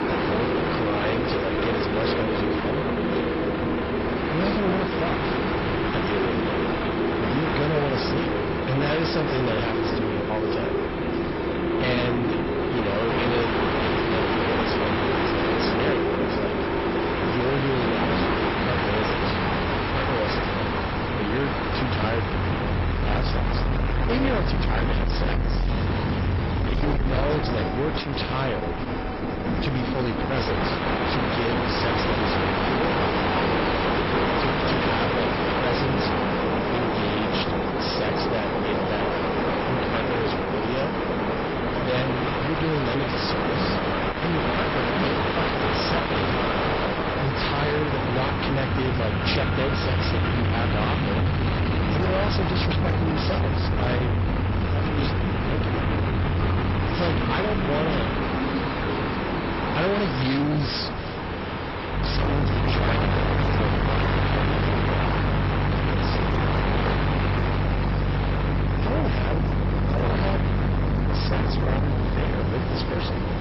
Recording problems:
distortion; heavy; 7 dB below the speech
garbled, watery; badly; nothing above 5.5 kHz
train or aircraft noise; very loud; throughout; 3 dB above the speech
wind noise on the microphone; occasional gusts; 15 dB below the speech

